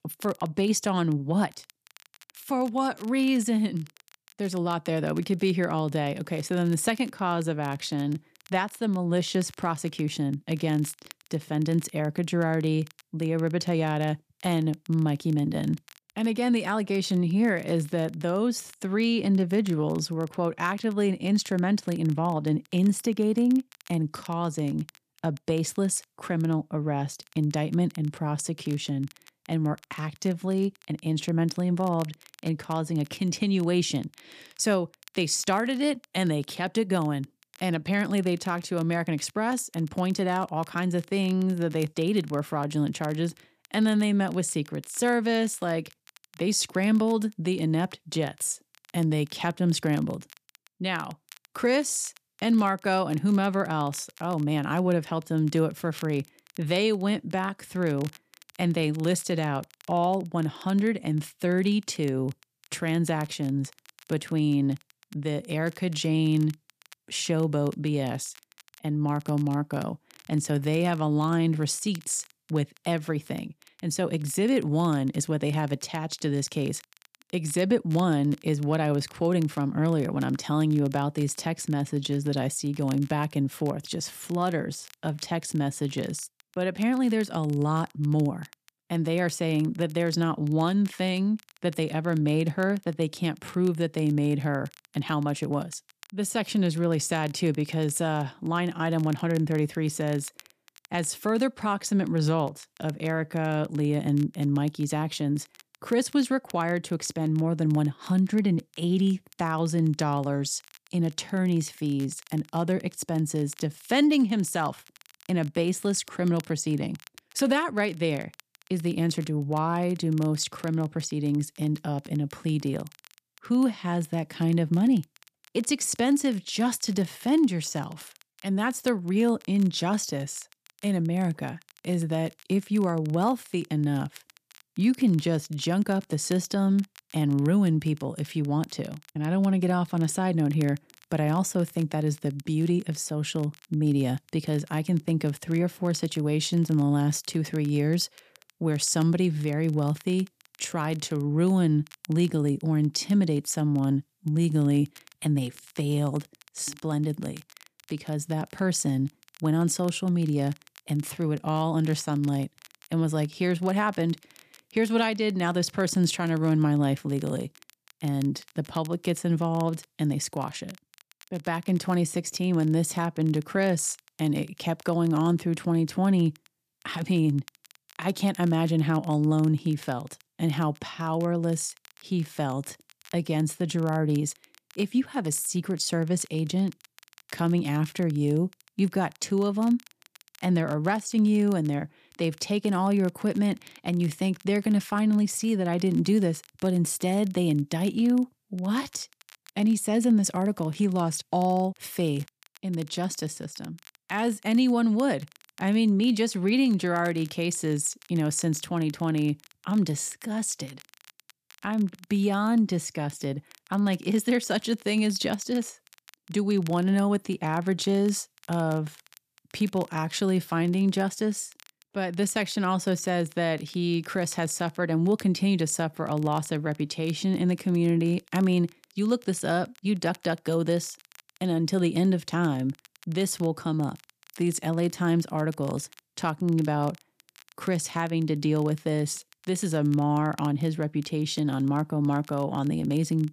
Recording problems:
crackle, like an old record; faint; 25 dB below the speech

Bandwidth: 14.5 kHz